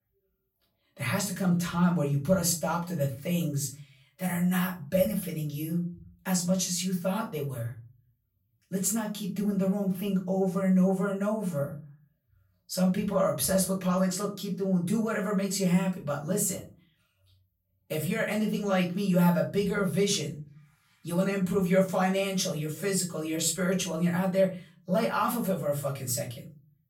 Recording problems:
off-mic speech; far
room echo; slight; dies away in 0.4 s

